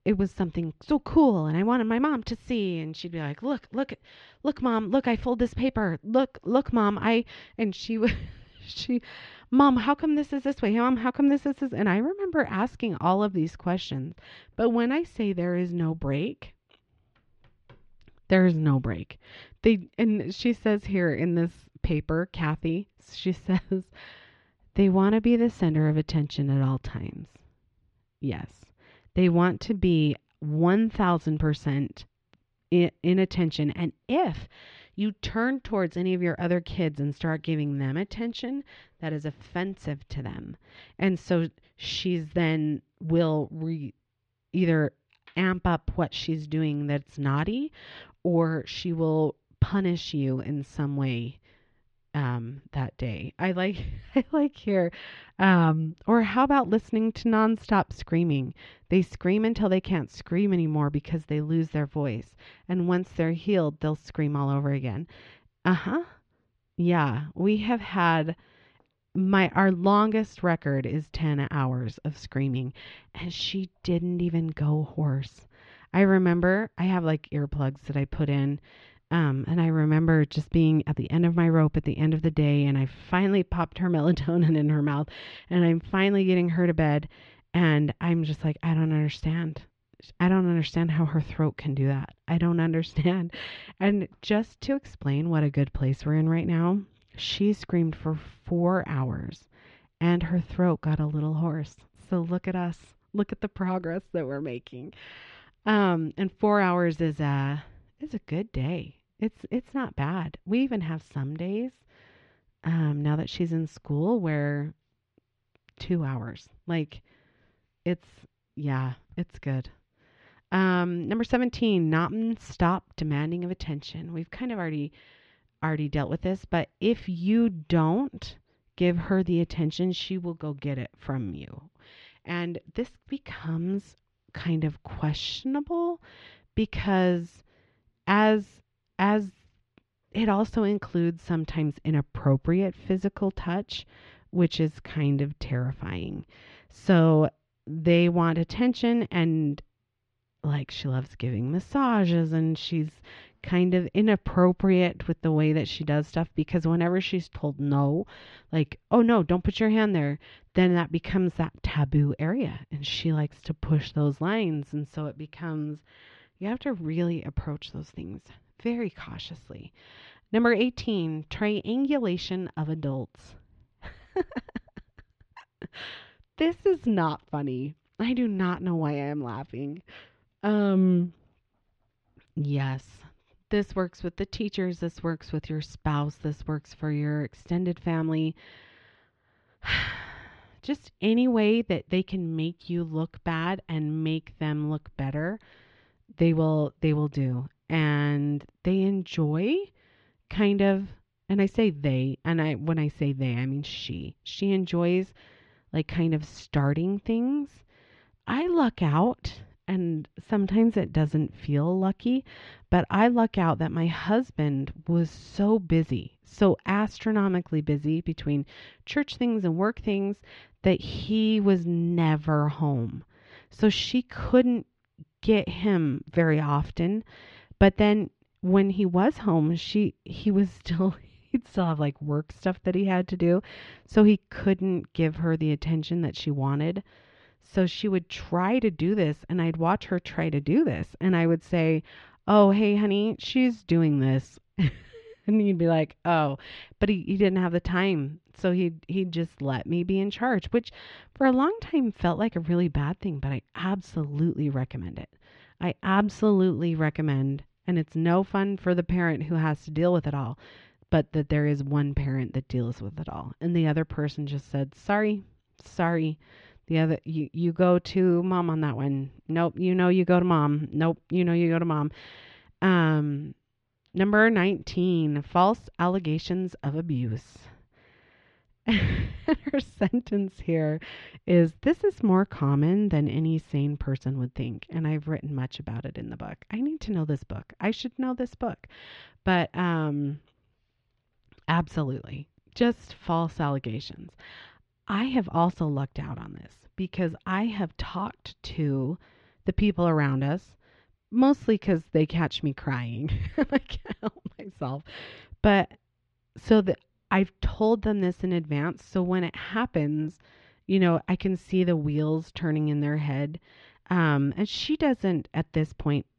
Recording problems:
muffled; slightly; fading above 3.5 kHz

